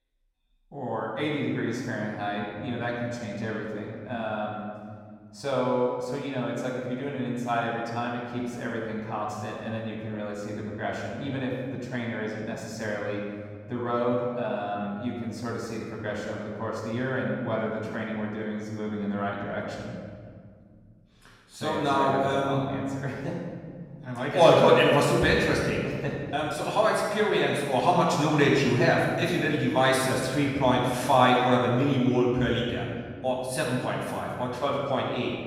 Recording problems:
off-mic speech; far
room echo; noticeable; dies away in 2 s

